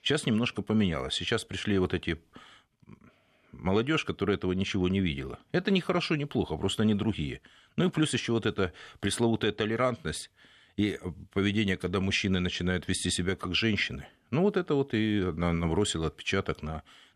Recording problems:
none

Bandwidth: 13.5 kHz